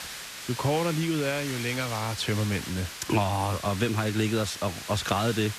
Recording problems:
hiss; loud; throughout; 8 dB below the speech

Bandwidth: 14.5 kHz